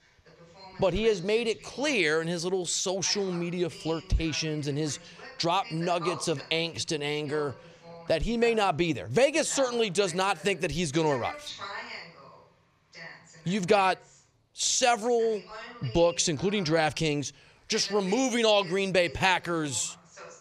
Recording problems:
voice in the background; noticeable; throughout; 15 dB below the speech

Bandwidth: 14.5 kHz